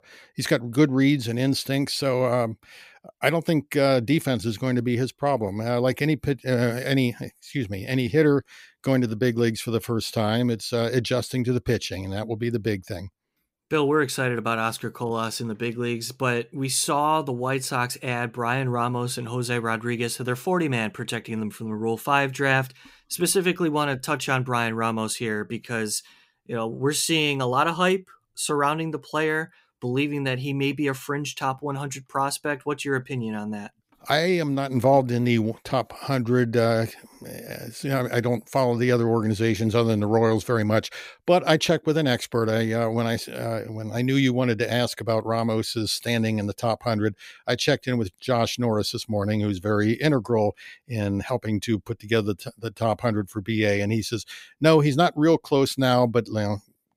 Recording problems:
none

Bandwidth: 15.5 kHz